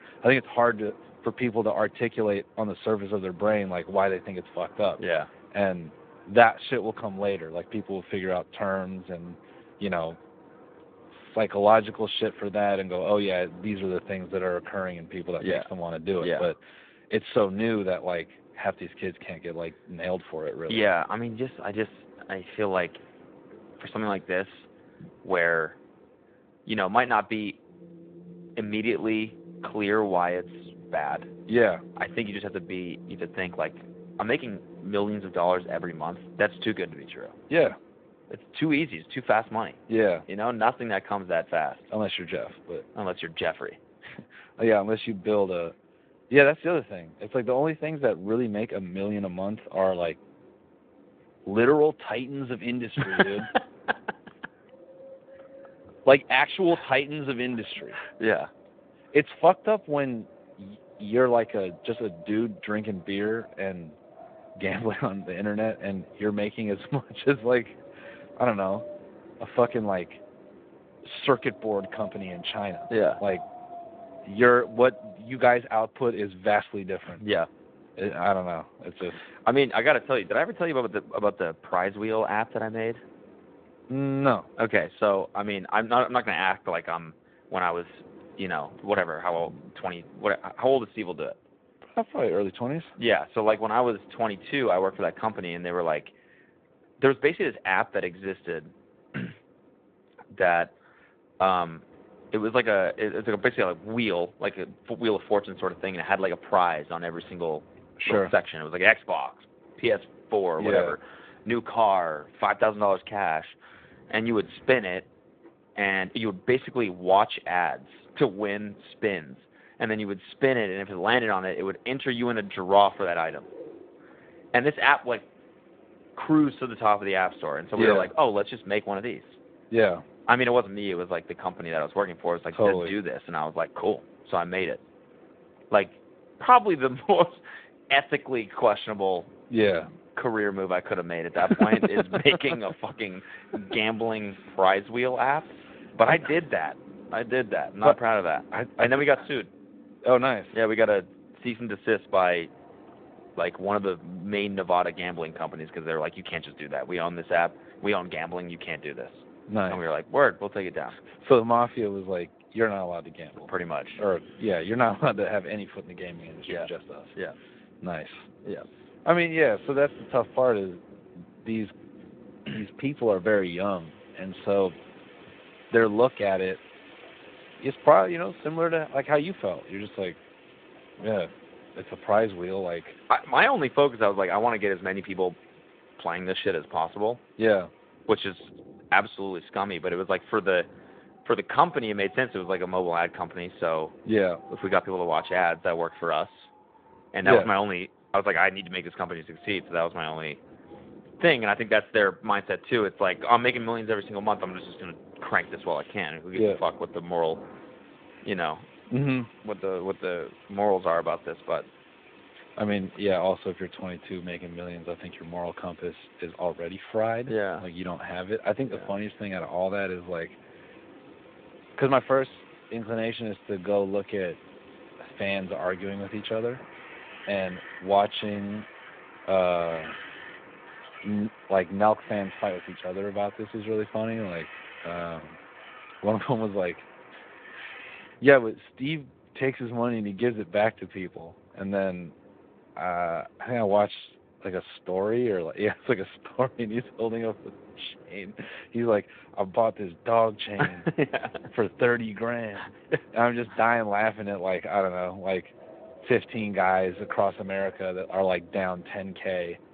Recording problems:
phone-call audio; nothing above 3.5 kHz
wind in the background; faint; throughout; 25 dB below the speech

